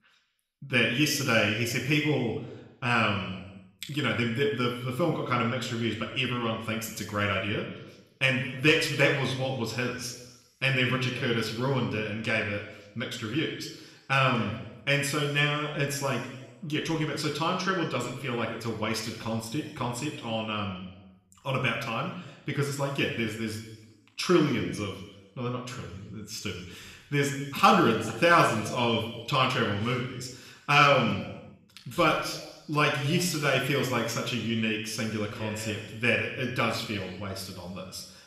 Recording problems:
room echo; noticeable; dies away in 1 s
off-mic speech; somewhat distant

